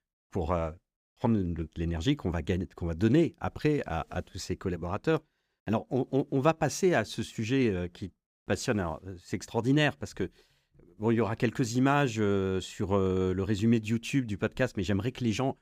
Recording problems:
none

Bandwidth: 15.5 kHz